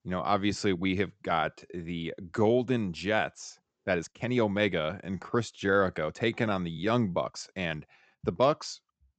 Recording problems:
high frequencies cut off; noticeable; nothing above 8 kHz
uneven, jittery; strongly; from 0.5 to 8.5 s

